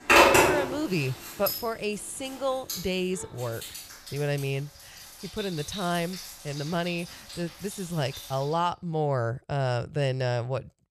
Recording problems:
household noises; very loud; until 8.5 s; 4 dB above the speech

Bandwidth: 14.5 kHz